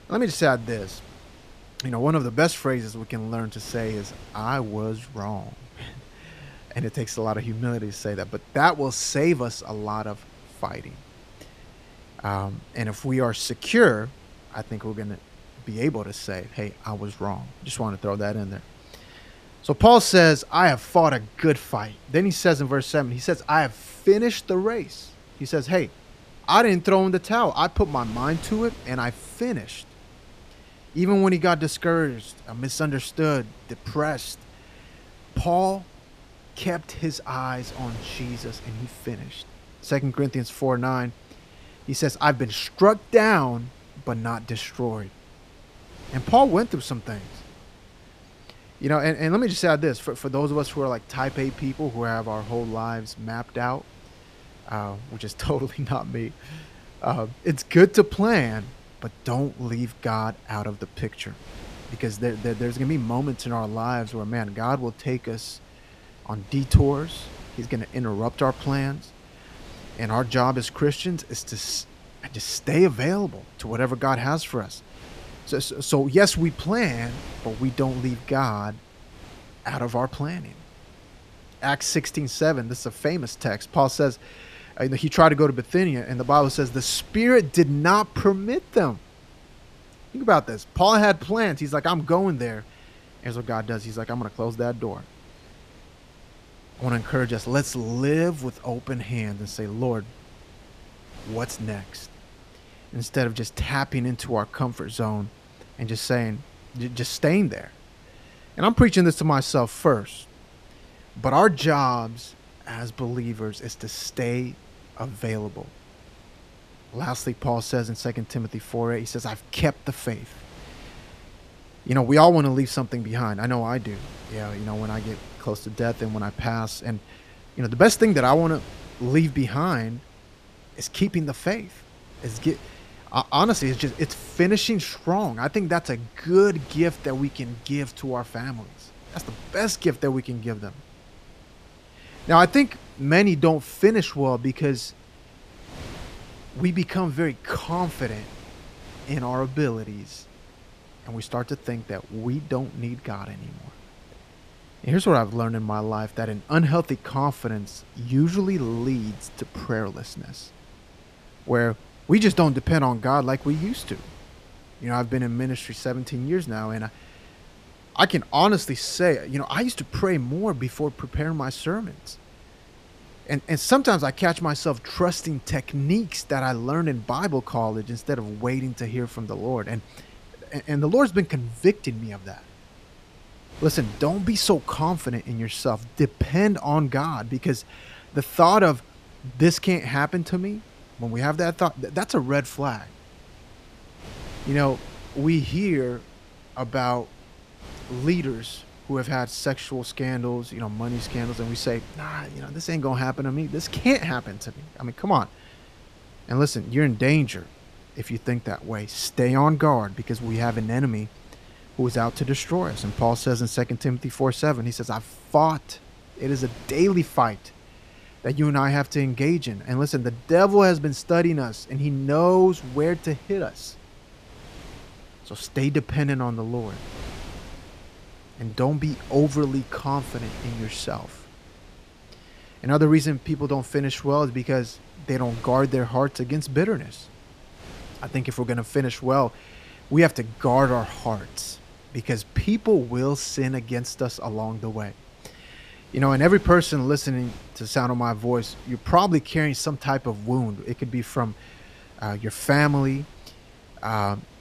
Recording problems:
wind noise on the microphone; occasional gusts; 25 dB below the speech

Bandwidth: 14.5 kHz